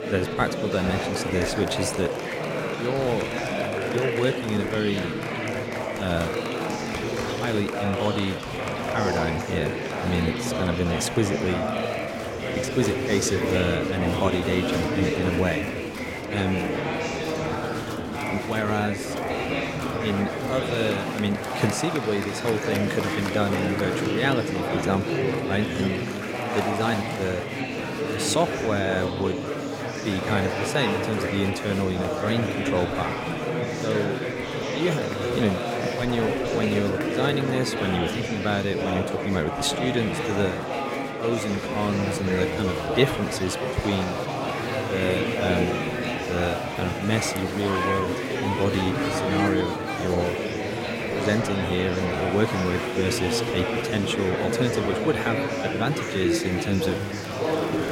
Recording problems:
murmuring crowd; loud; throughout; as loud as the speech

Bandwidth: 16.5 kHz